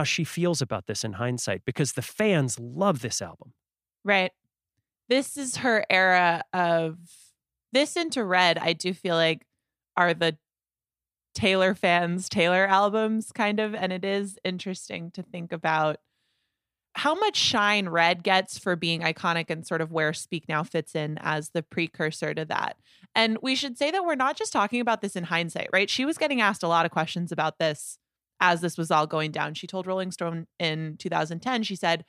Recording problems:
abrupt cut into speech; at the start

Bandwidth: 15 kHz